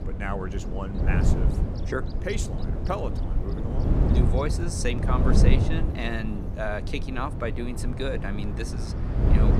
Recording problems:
wind noise on the microphone; heavy; 4 dB below the speech
traffic noise; noticeable; throughout; 20 dB below the speech
electrical hum; faint; throughout; 60 Hz, 25 dB below the speech

